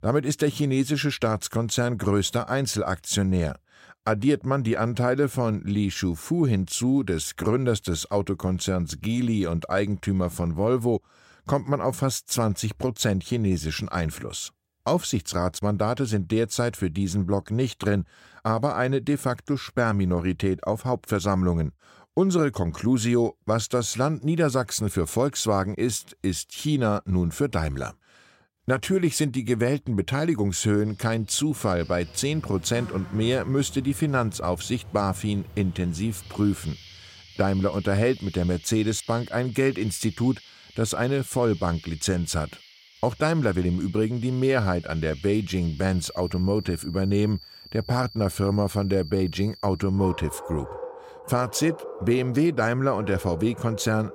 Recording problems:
animal sounds; noticeable; from 31 s on; 15 dB below the speech

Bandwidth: 16 kHz